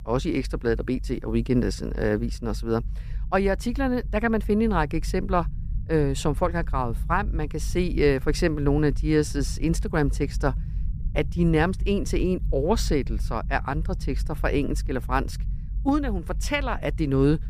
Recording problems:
low rumble; faint; throughout; 25 dB below the speech

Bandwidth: 15 kHz